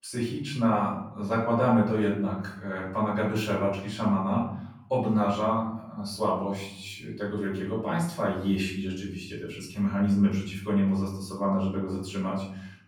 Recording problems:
off-mic speech; far
room echo; noticeable; dies away in 0.7 s

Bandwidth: 17.5 kHz